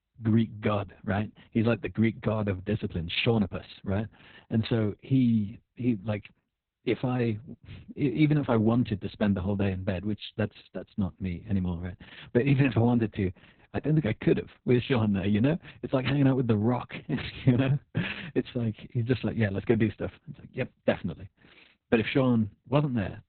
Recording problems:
garbled, watery; badly; nothing above 4 kHz

